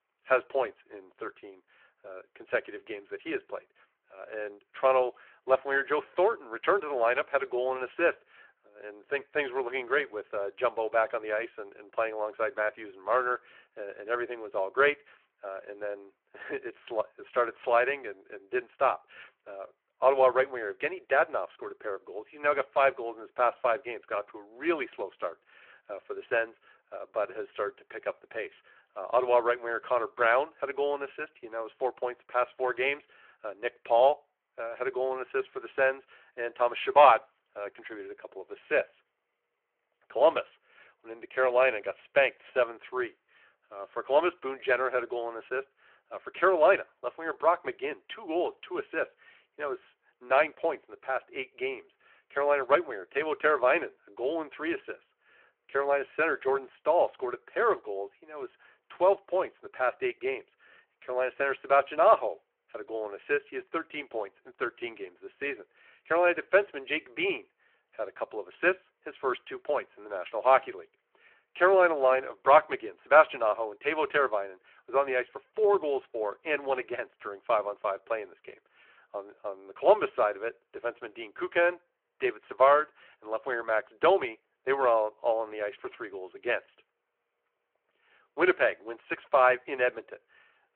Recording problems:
phone-call audio

